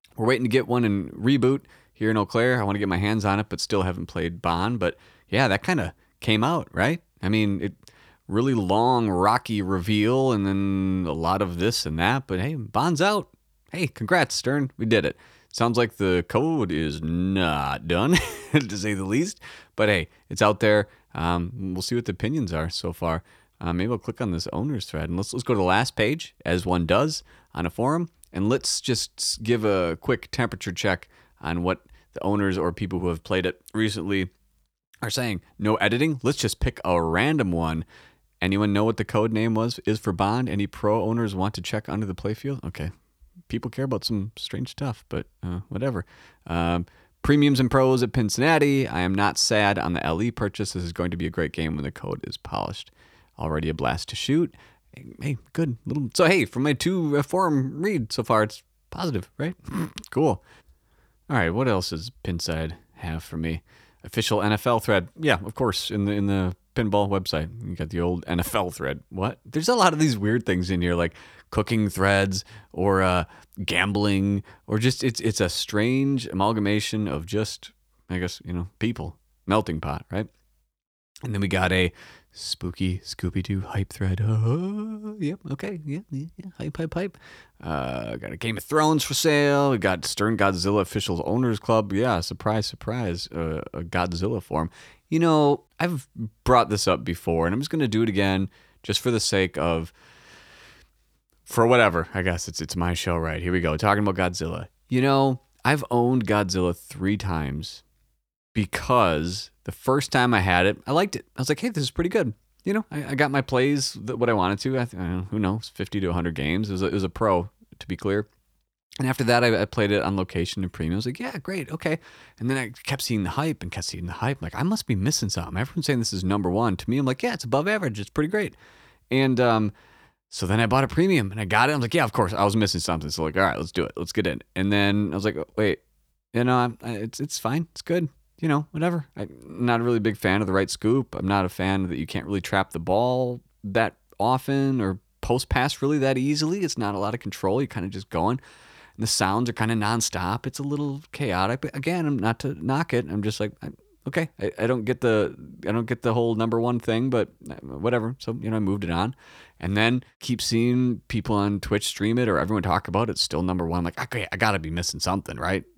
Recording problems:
none

